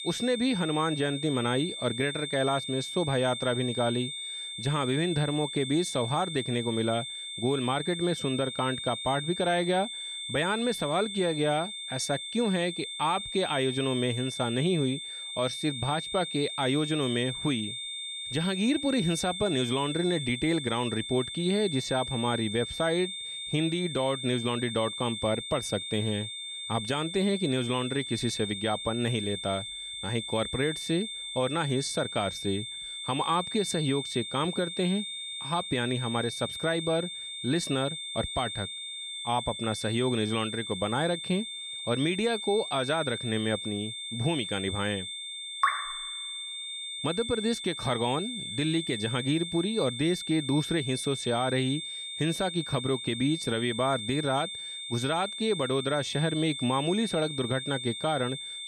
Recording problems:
high-pitched whine; loud; throughout; 3.5 kHz, 5 dB below the speech

